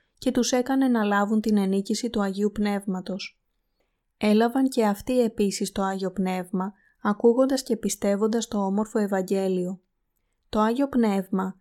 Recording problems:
none

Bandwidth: 17.5 kHz